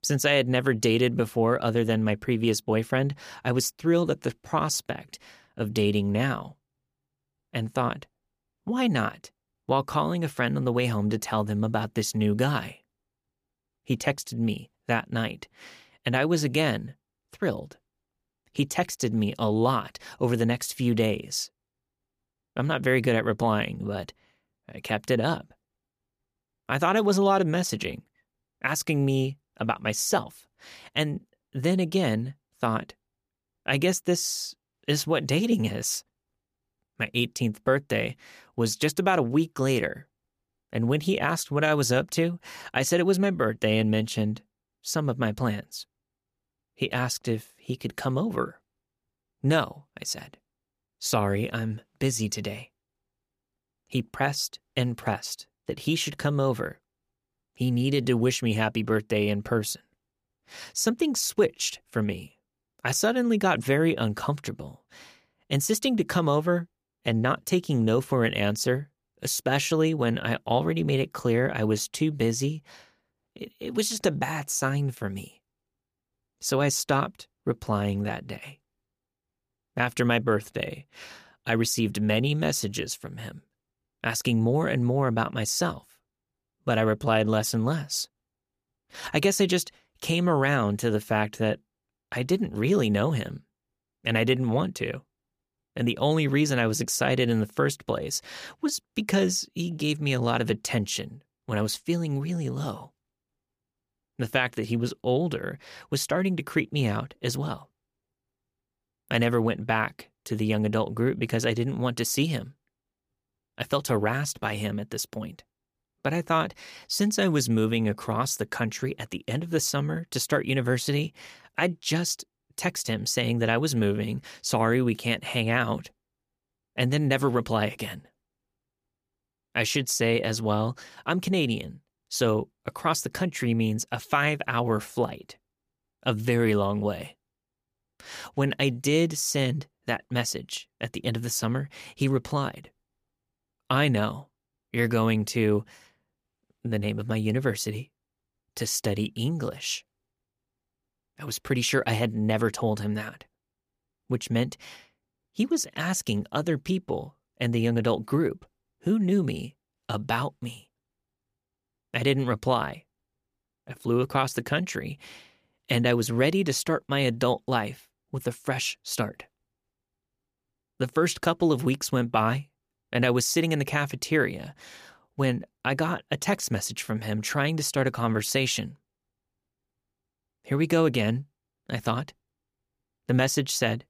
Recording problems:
none

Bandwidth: 15 kHz